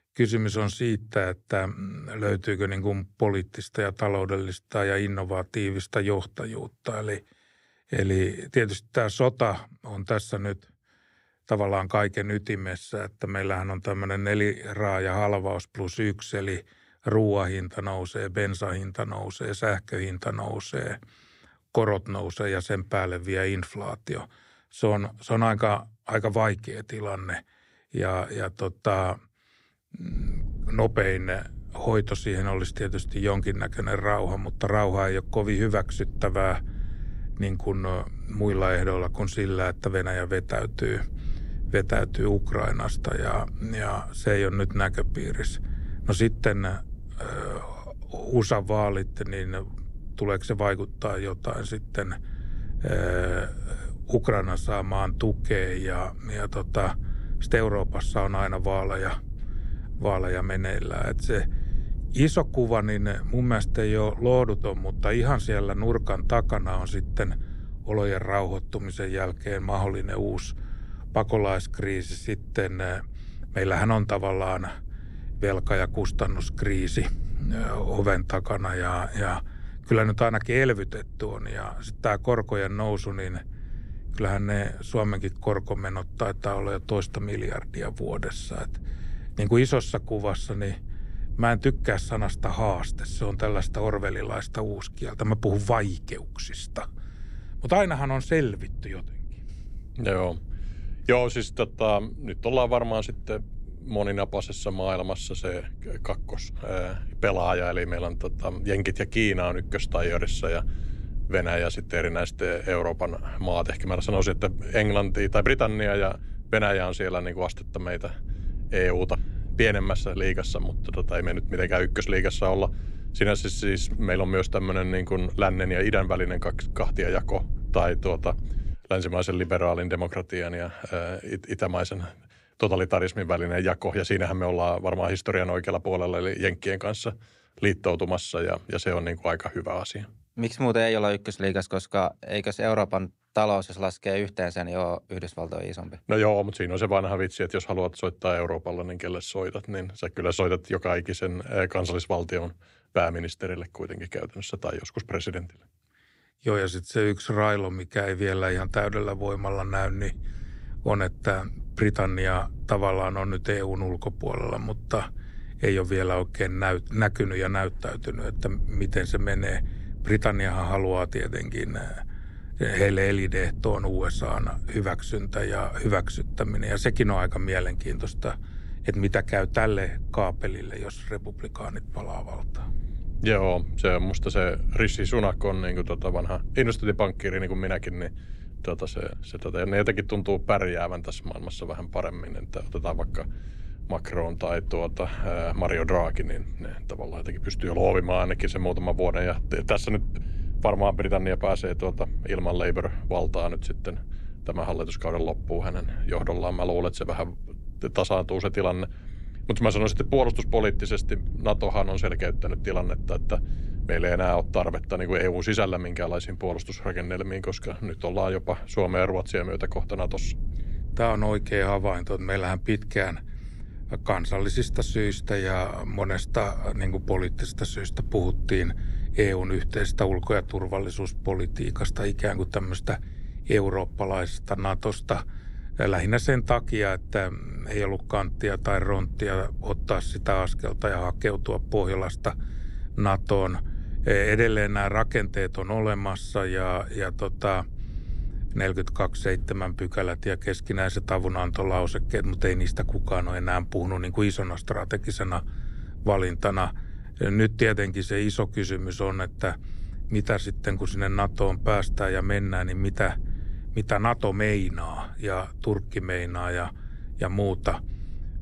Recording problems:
low rumble; faint; from 30 s to 2:09 and from 2:39 on; 25 dB below the speech

